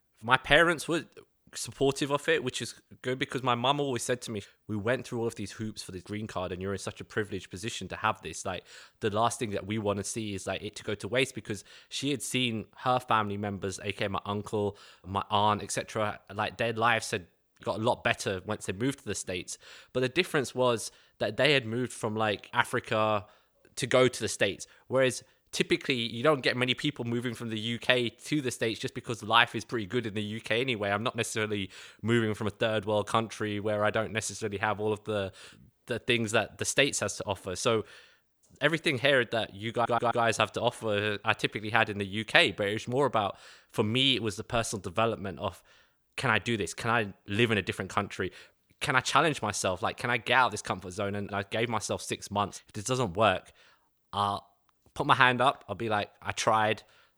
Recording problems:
audio stuttering; at 40 s

